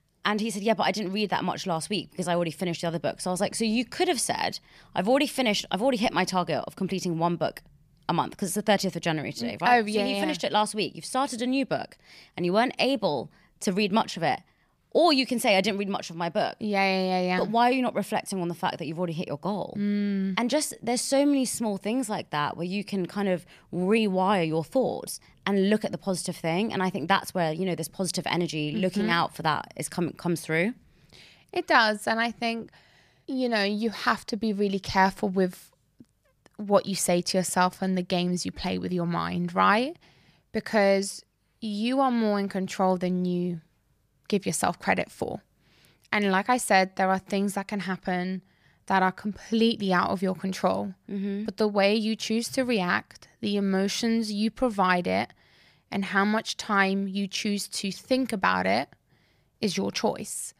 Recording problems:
none

